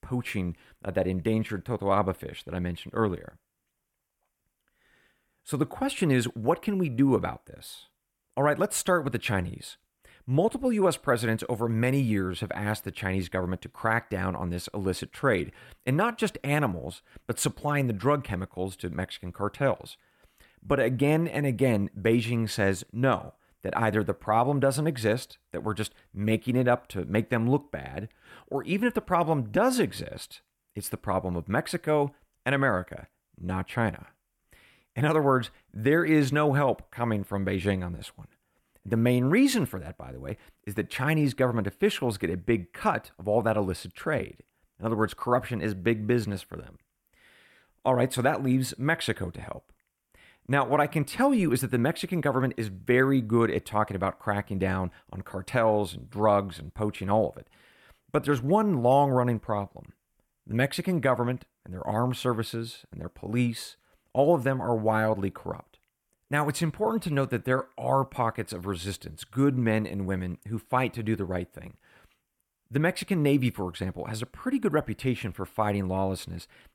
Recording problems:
none

